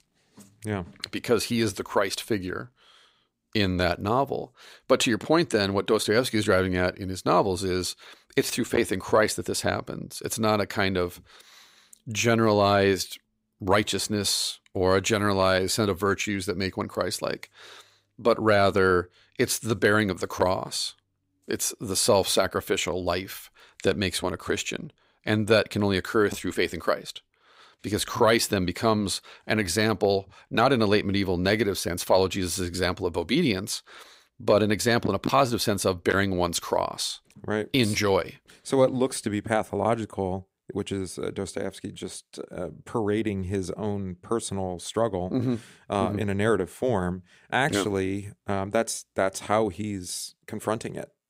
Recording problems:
none

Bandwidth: 15.5 kHz